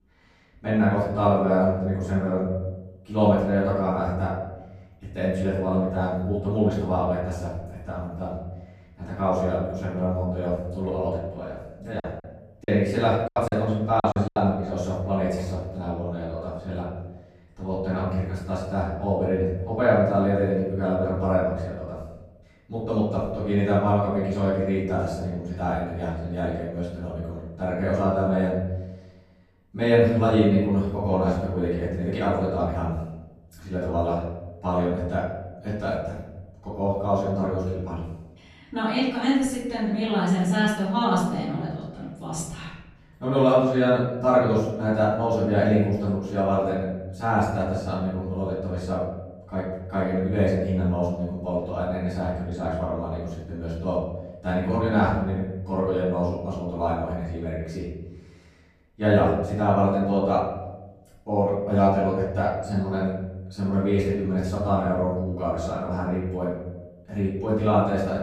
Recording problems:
off-mic speech; far
room echo; noticeable; dies away in 1.1 s
choppy; very; from 12 to 14 s; 18% of the speech affected

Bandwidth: 14.5 kHz